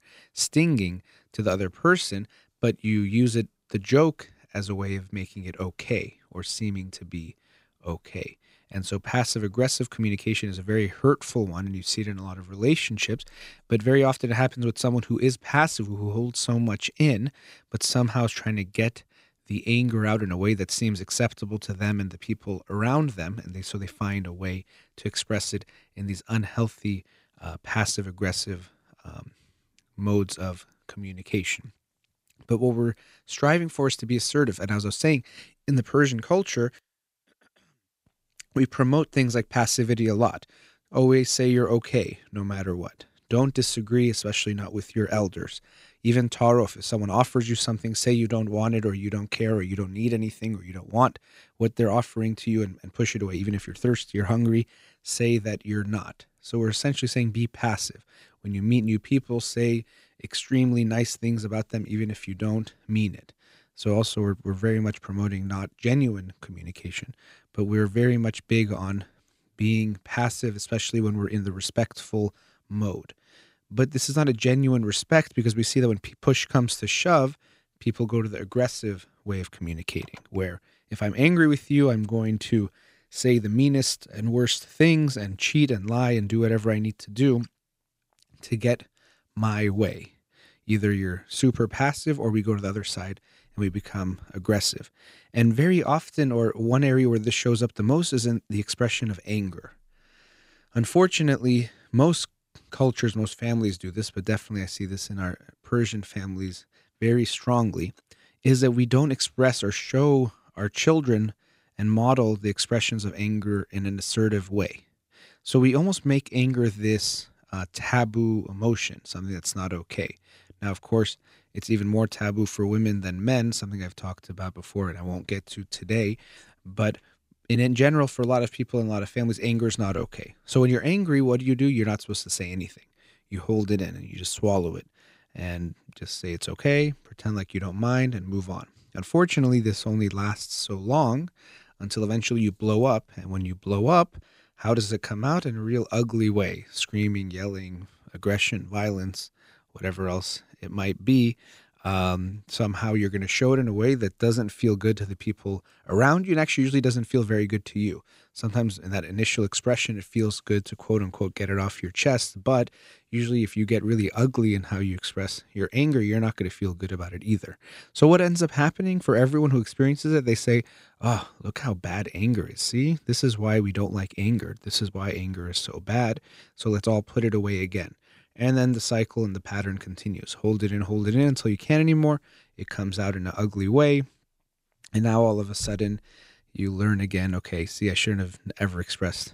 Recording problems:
none

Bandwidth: 15.5 kHz